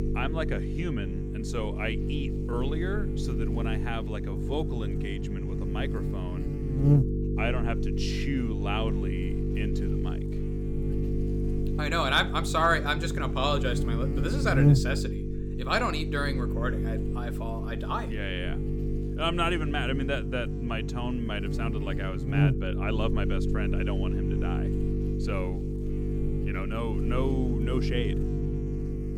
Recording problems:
electrical hum; loud; throughout; 50 Hz, 6 dB below the speech

